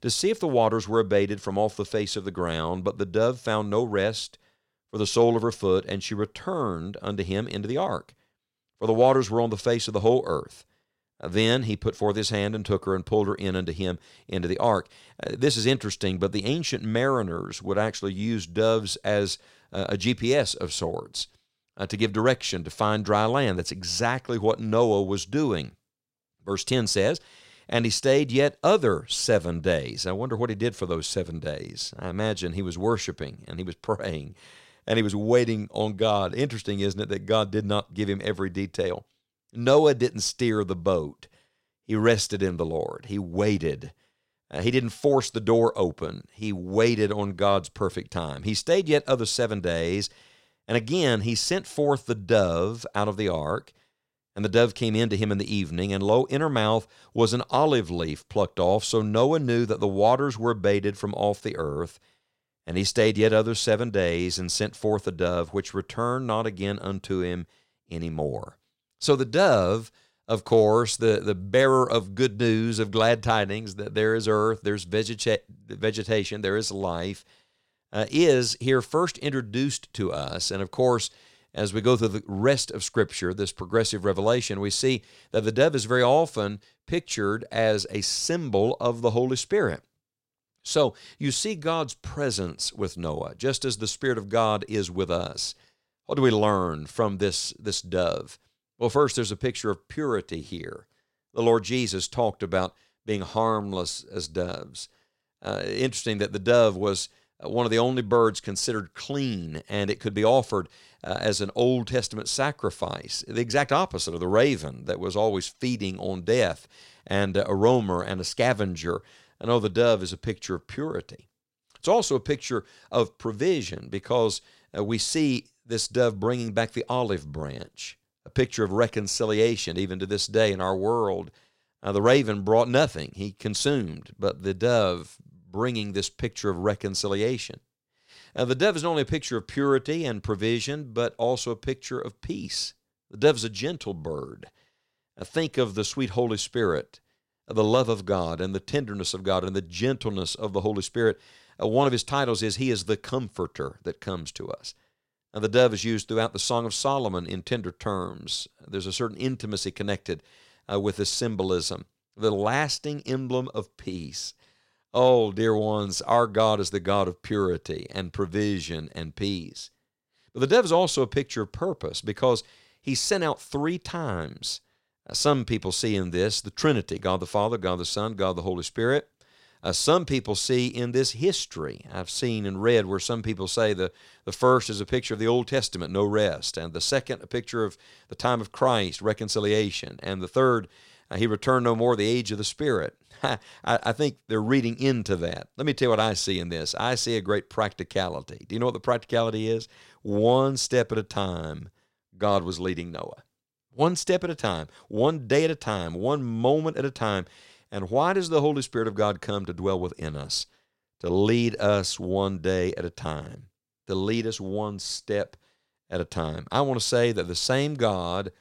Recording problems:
none

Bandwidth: 16 kHz